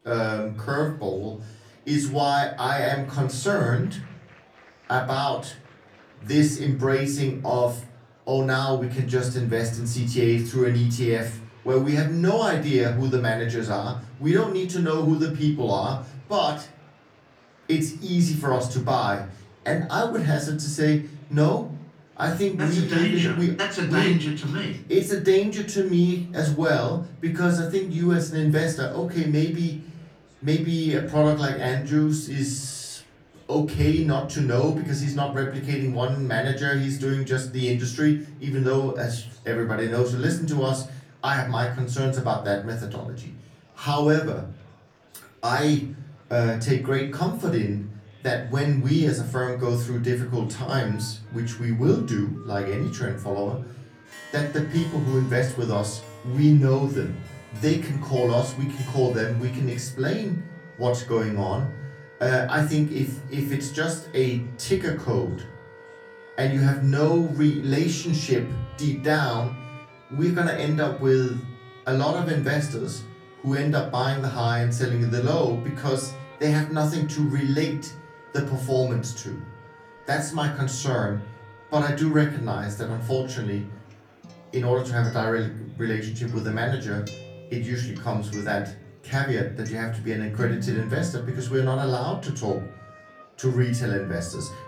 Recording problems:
off-mic speech; far
room echo; slight; dies away in 0.4 s
background music; faint; from 50 s on; 20 dB below the speech
murmuring crowd; faint; throughout; 30 dB below the speech

